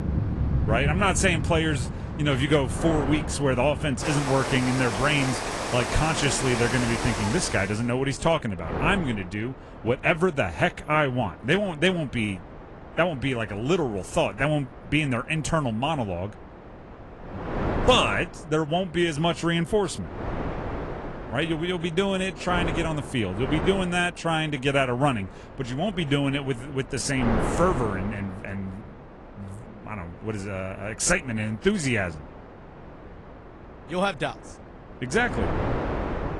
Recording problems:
garbled, watery; slightly
rain or running water; loud; until 7.5 s; 5 dB below the speech
wind noise on the microphone; occasional gusts; 10 dB below the speech

